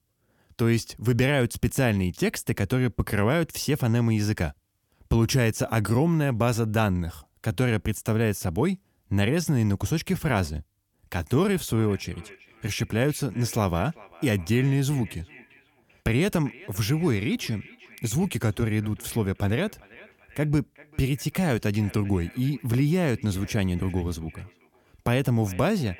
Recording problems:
echo of what is said; faint; from 11 s on; 390 ms later, 25 dB below the speech

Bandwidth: 17.5 kHz